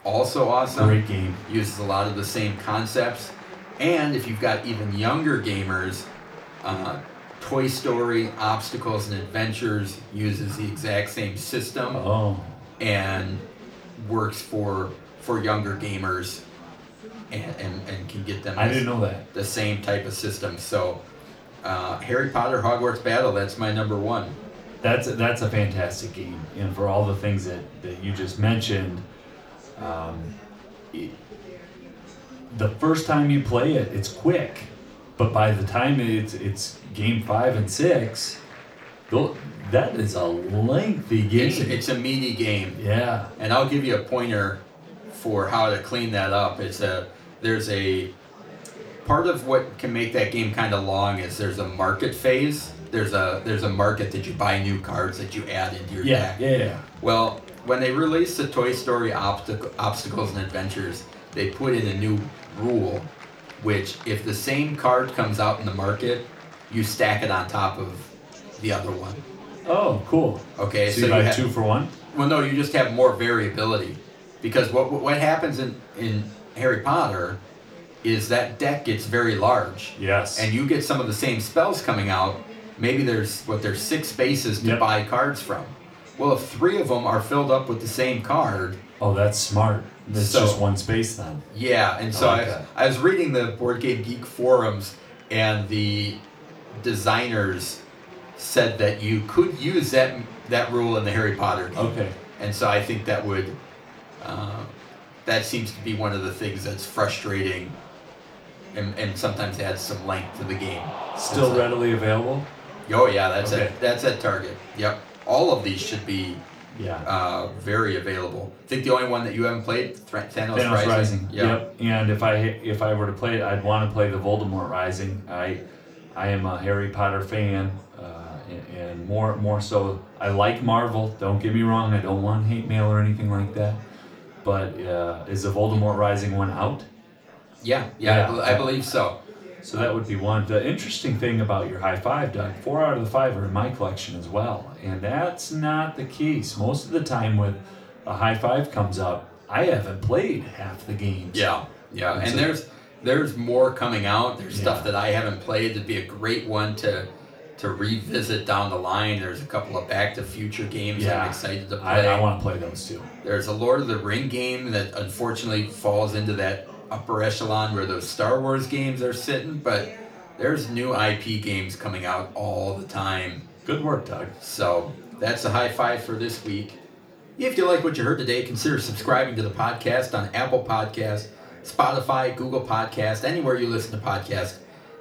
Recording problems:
off-mic speech; far
room echo; slight; dies away in 0.3 s
murmuring crowd; noticeable; throughout; 20 dB below the speech

